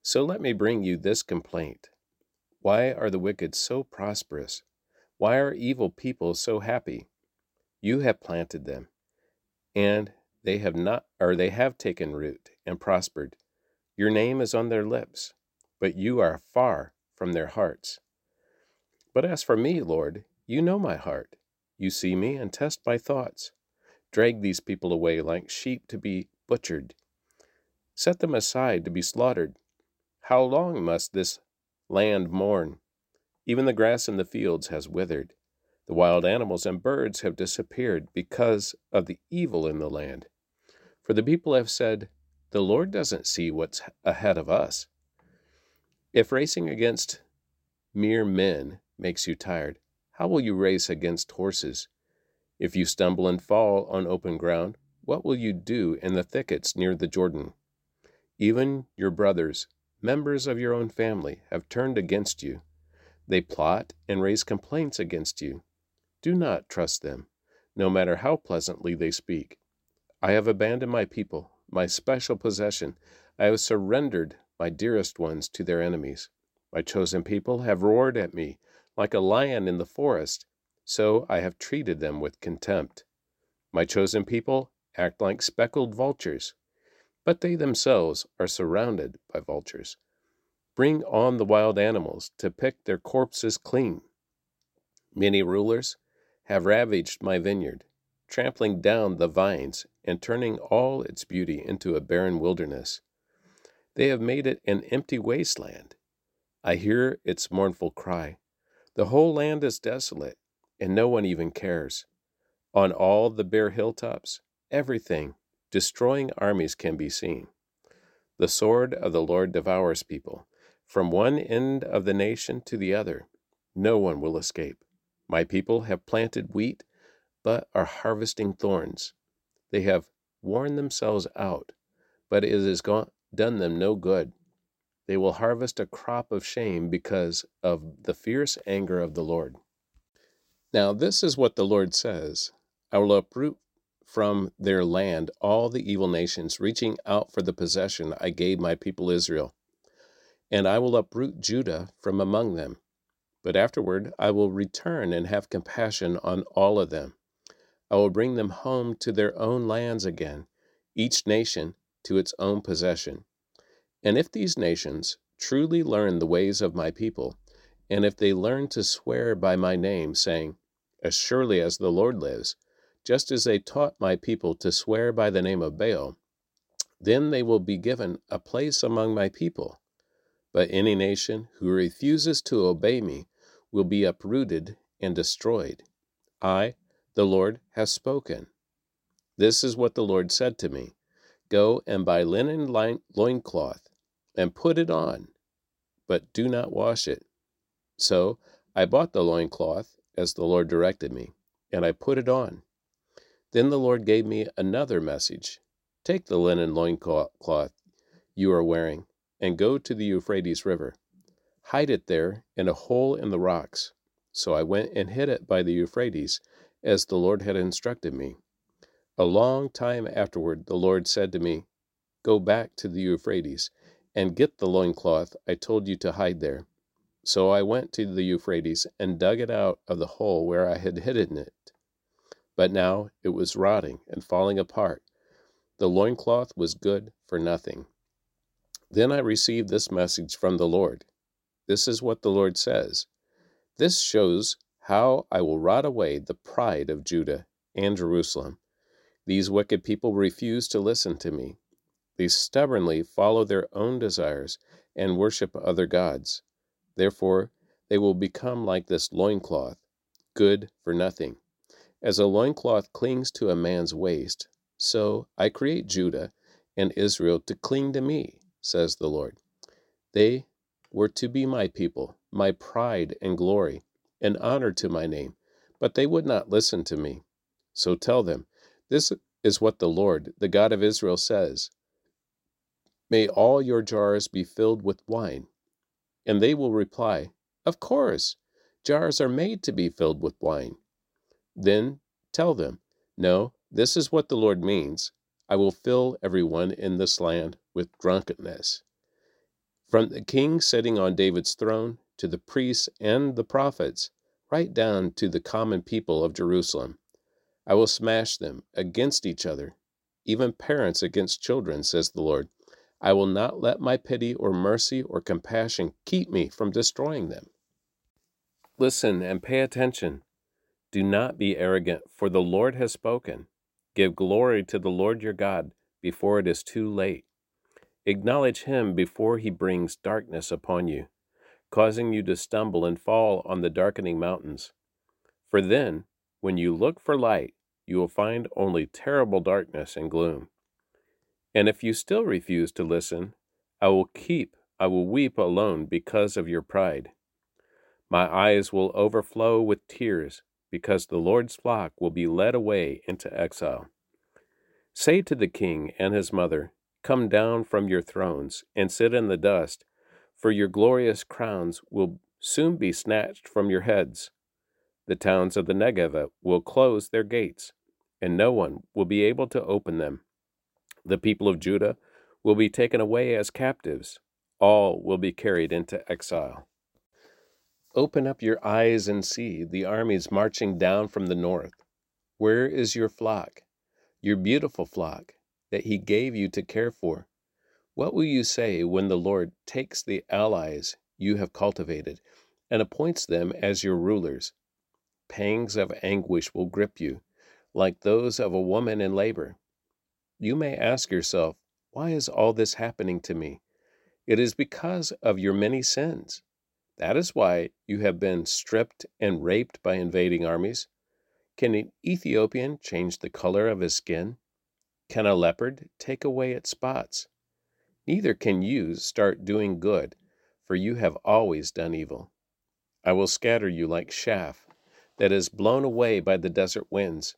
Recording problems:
none

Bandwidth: 16 kHz